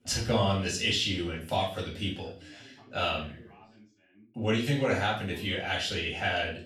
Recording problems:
off-mic speech; far
room echo; slight; dies away in 0.4 s
background chatter; faint; throughout; 2 voices, 25 dB below the speech

